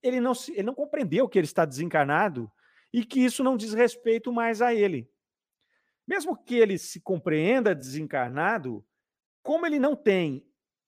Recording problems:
uneven, jittery; strongly; from 0.5 to 10 s

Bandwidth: 15 kHz